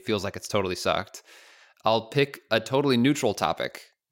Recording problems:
none

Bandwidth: 16 kHz